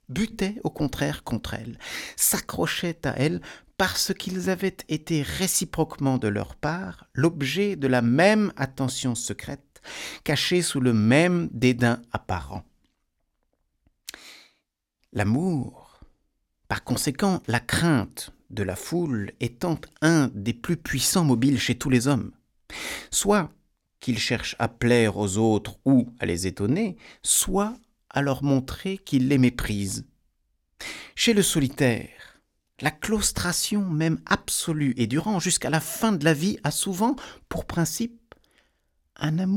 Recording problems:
abrupt cut into speech; at the end

